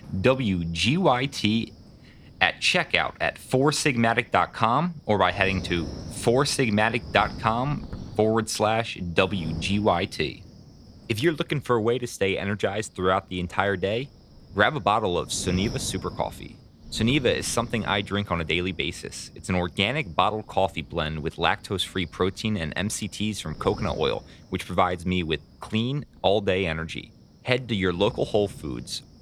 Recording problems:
wind noise on the microphone; occasional gusts; 25 dB below the speech

